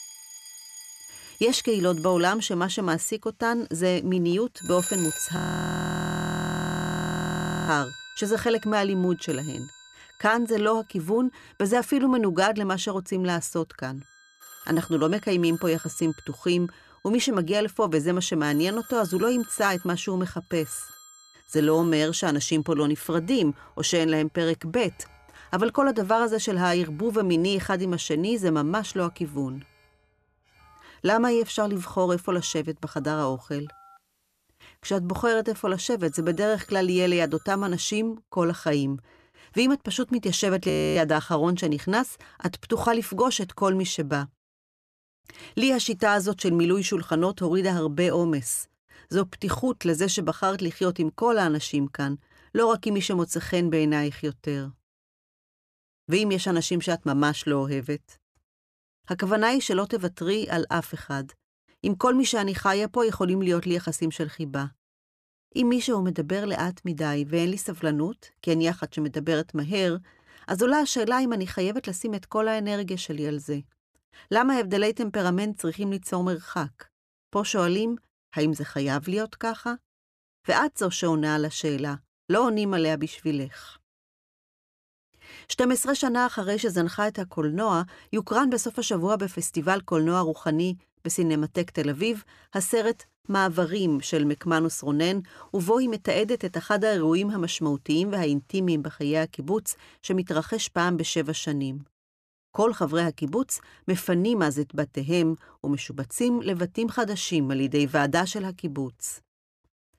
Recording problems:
alarms or sirens; noticeable; until 38 s; 15 dB below the speech
audio freezing; at 5.5 s for 2.5 s and at 41 s

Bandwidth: 14.5 kHz